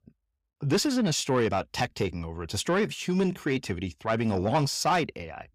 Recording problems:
distortion; slight; 10 dB below the speech

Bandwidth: 15.5 kHz